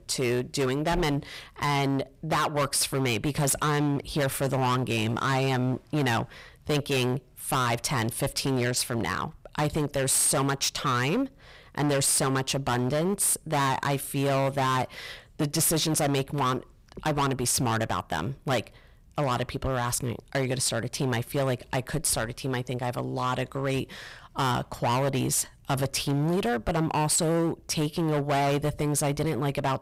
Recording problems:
distortion; heavy; 17% of the sound clipped

